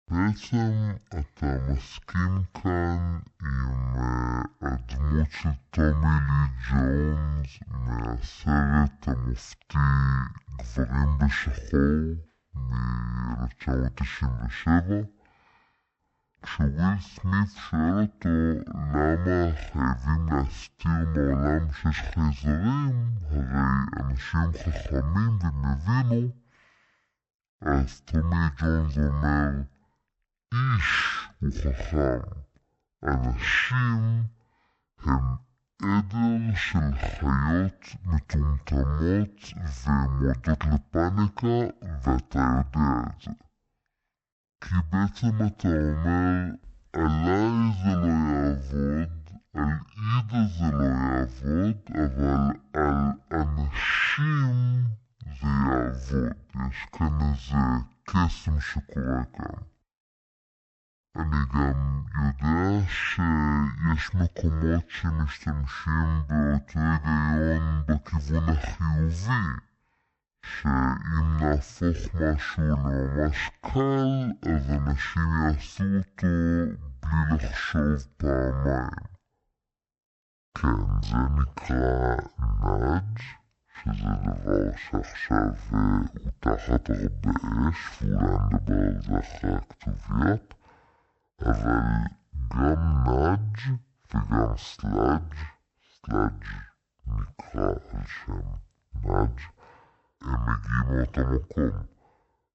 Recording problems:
wrong speed and pitch; too slow and too low; 0.5 times normal speed

